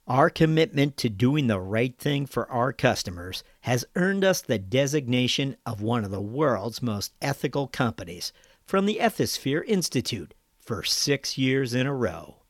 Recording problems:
none

